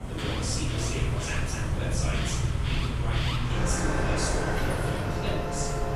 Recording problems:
room echo; strong; dies away in 1 s
off-mic speech; far
traffic noise; very loud; throughout; 4 dB above the speech
alarms or sirens; loud; throughout; 5 dB below the speech
rain or running water; loud; throughout; 4 dB below the speech
low rumble; faint; throughout; 25 dB below the speech

